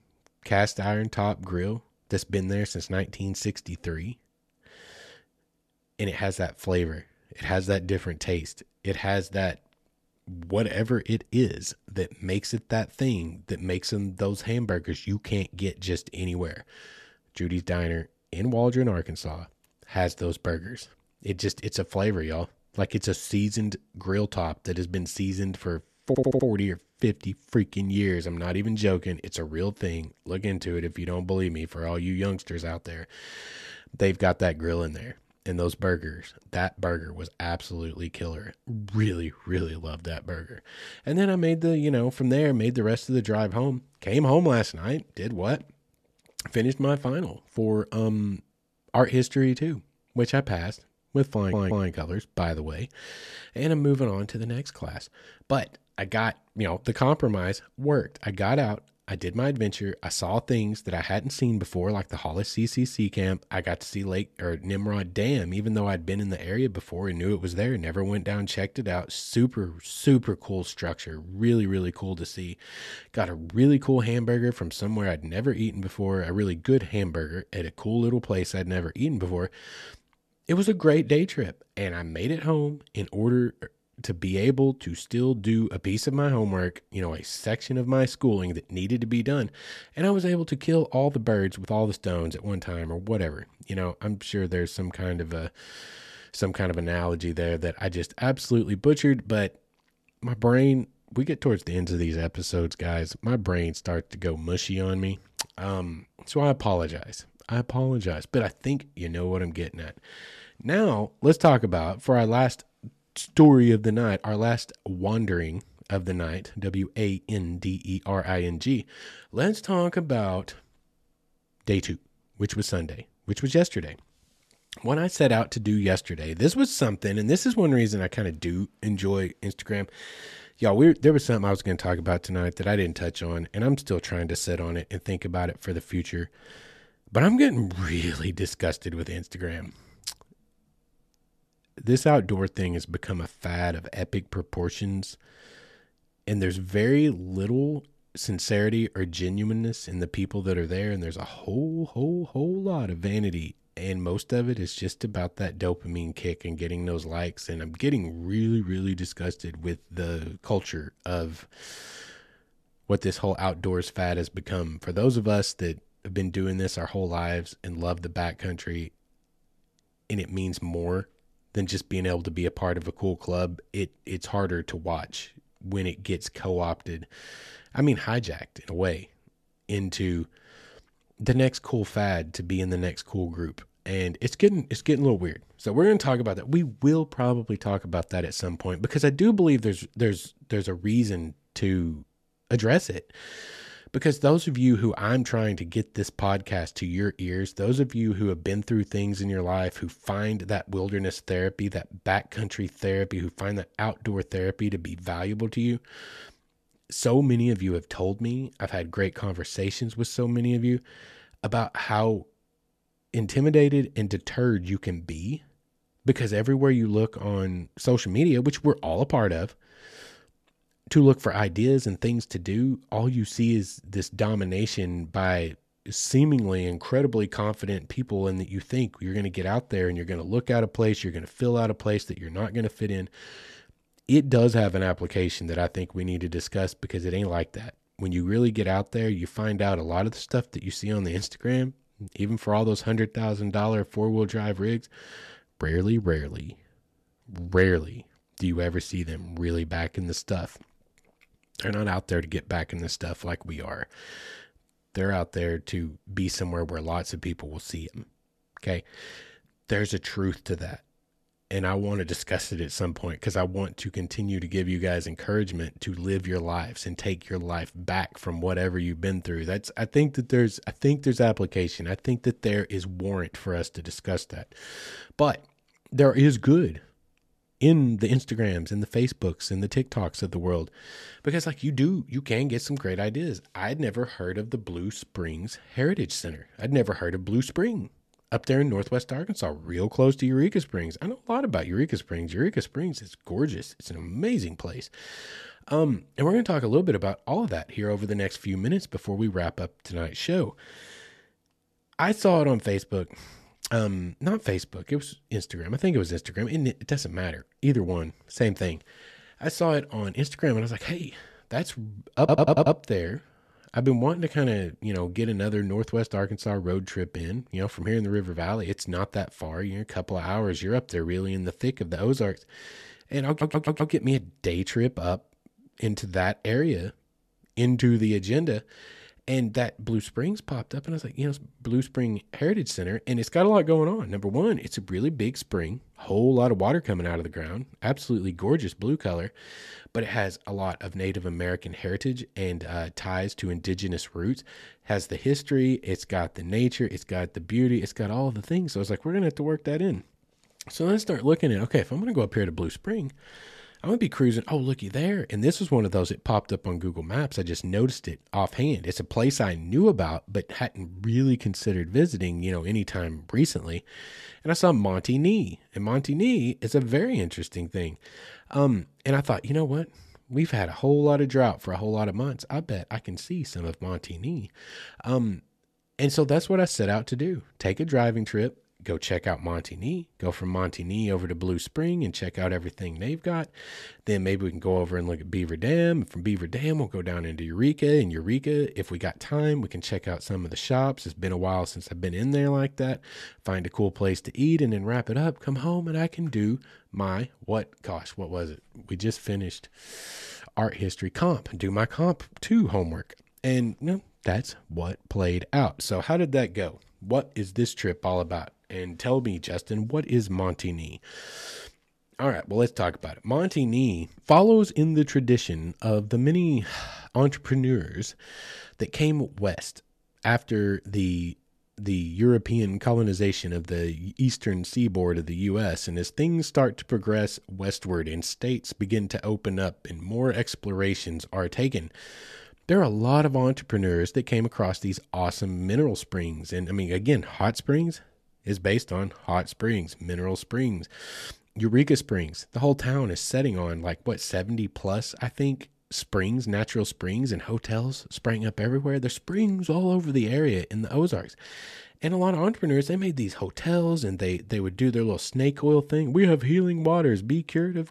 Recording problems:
audio stuttering; 4 times, first at 26 s

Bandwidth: 13.5 kHz